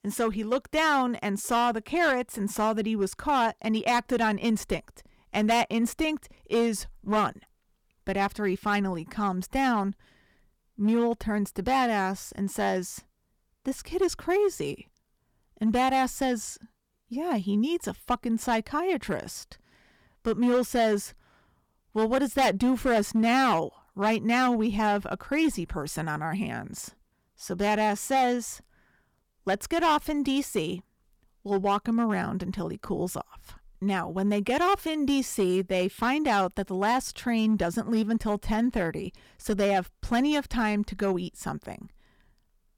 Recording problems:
distortion; slight; 5% of the sound clipped

